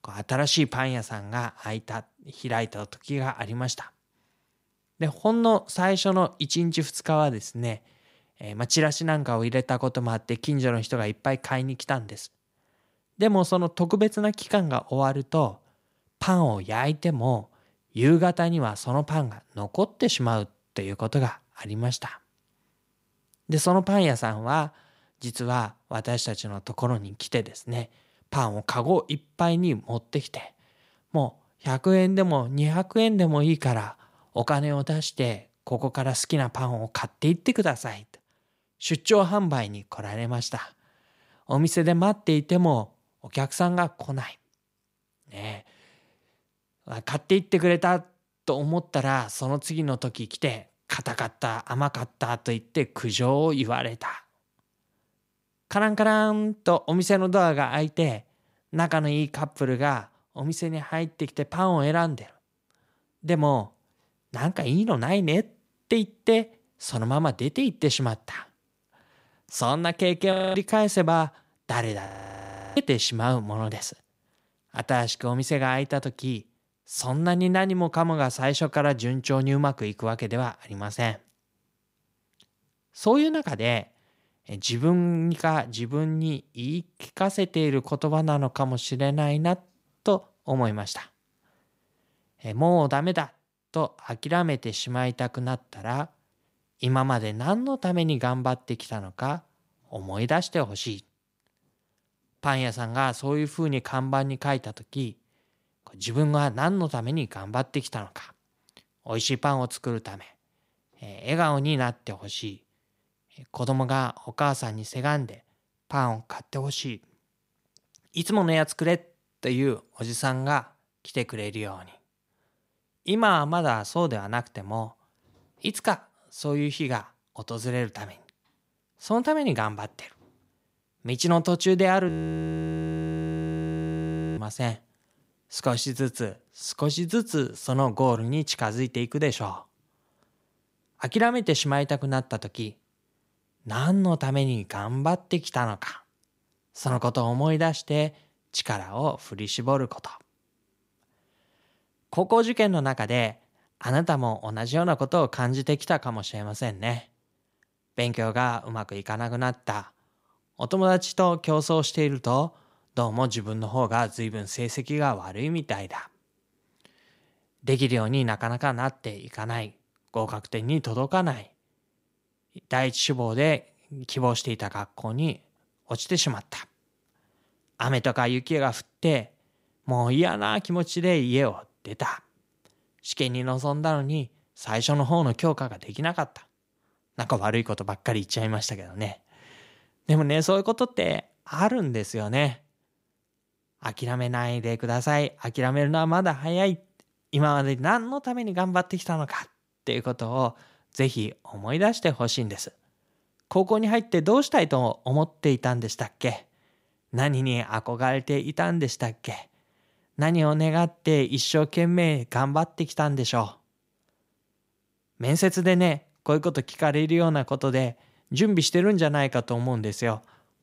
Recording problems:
audio freezing; at 1:10, at 1:12 for 0.5 s and at 2:12 for 2.5 s

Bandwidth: 15.5 kHz